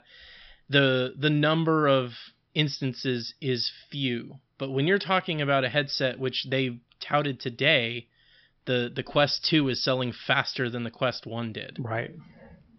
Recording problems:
high frequencies cut off; noticeable; nothing above 5.5 kHz

